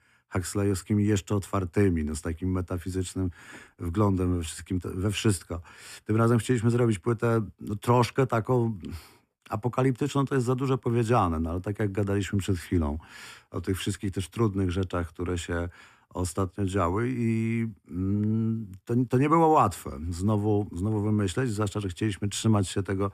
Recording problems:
none

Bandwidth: 14.5 kHz